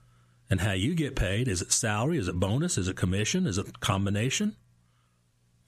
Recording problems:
squashed, flat; somewhat

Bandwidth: 14.5 kHz